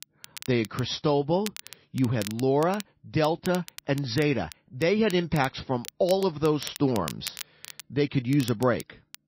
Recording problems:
garbled, watery; slightly; nothing above 6 kHz
crackle, like an old record; noticeable; 15 dB below the speech

